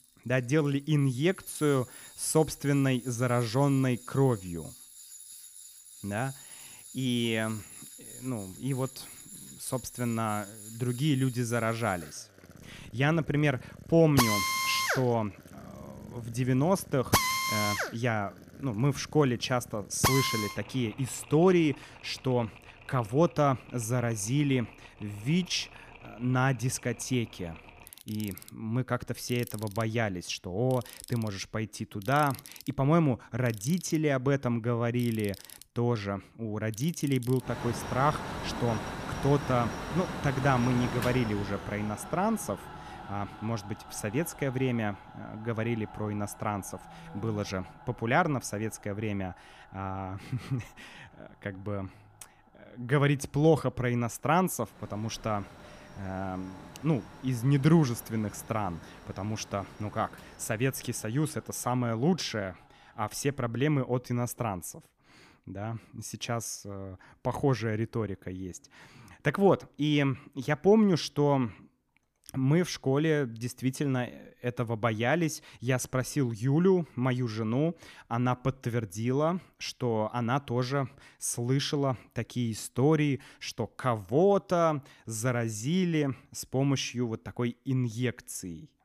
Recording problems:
machinery noise; loud; until 1:03; 8 dB below the speech

